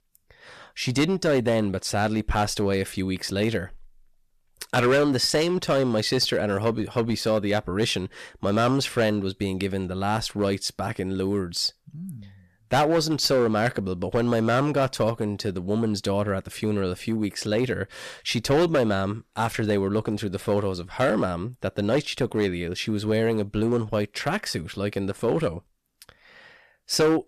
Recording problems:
distortion; slight; 5% of the sound clipped

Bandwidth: 14.5 kHz